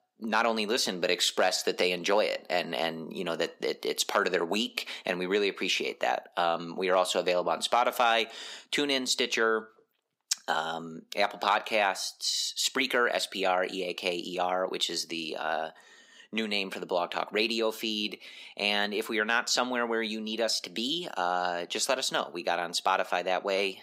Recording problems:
thin; somewhat; fading below 450 Hz

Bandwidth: 15.5 kHz